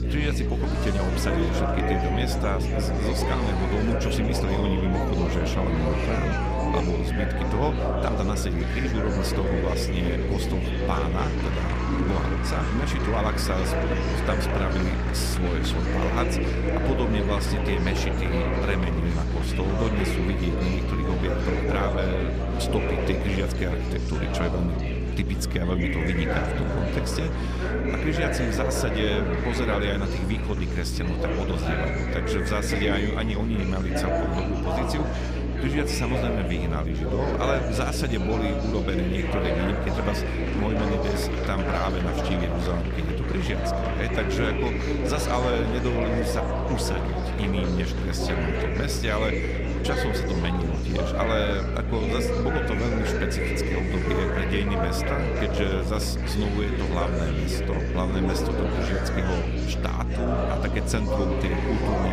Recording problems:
electrical hum; loud; throughout; 60 Hz, 9 dB below the speech
murmuring crowd; loud; throughout; as loud as the speech
animal sounds; noticeable; throughout; 15 dB below the speech
abrupt cut into speech; at the end

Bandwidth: 15 kHz